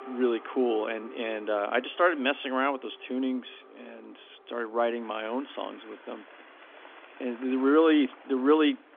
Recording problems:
phone-call audio; nothing above 3.5 kHz
traffic noise; faint; throughout; 20 dB below the speech

